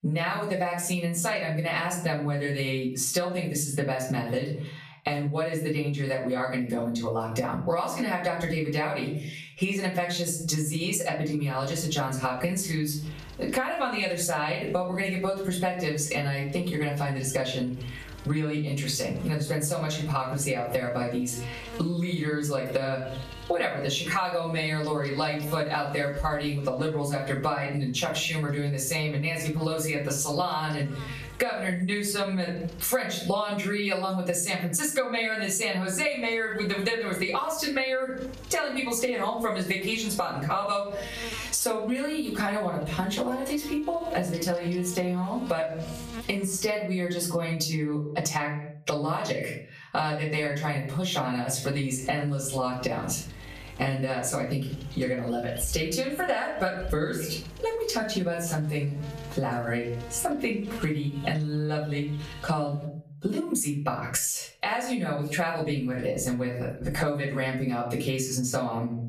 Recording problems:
off-mic speech; far
room echo; slight; dies away in 0.4 s
squashed, flat; somewhat
electrical hum; noticeable; from 12 to 33 s, from 36 to 47 s and from 52 s to 1:03; 50 Hz, 20 dB below the speech

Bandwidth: 14.5 kHz